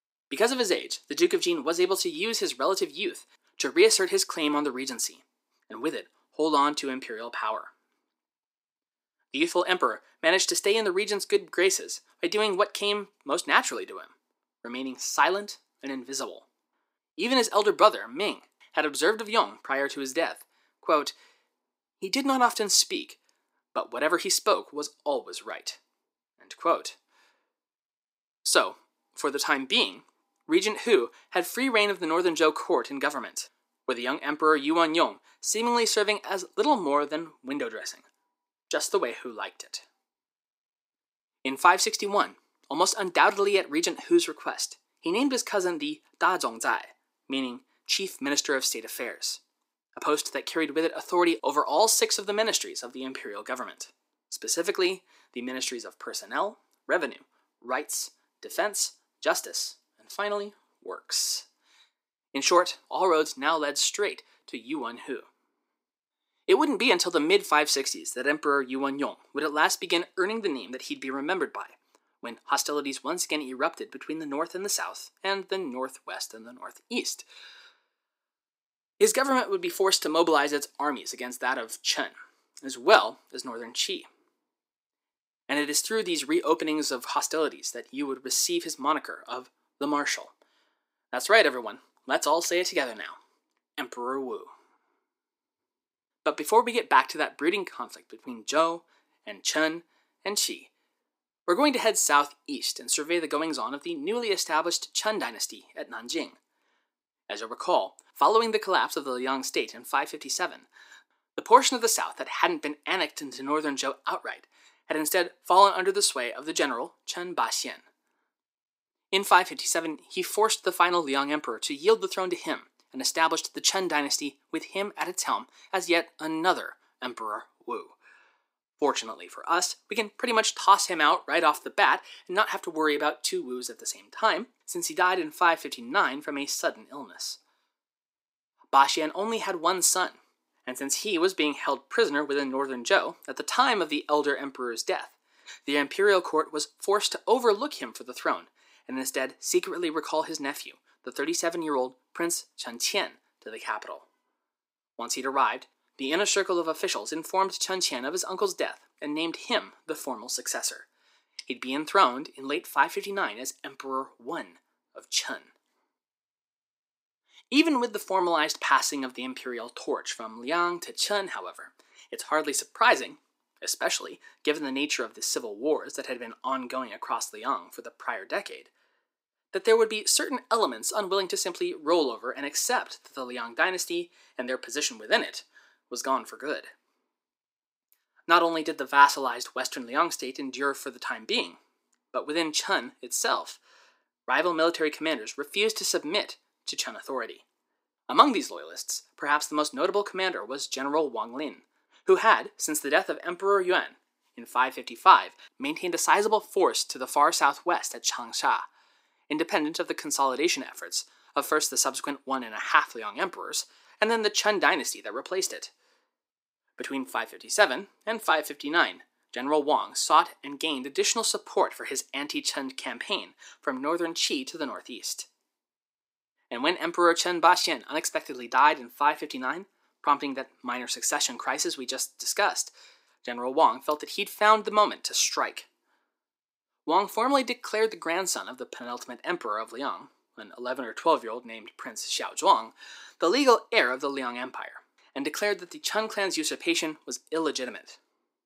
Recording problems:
thin; somewhat; fading below 350 Hz

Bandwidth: 15.5 kHz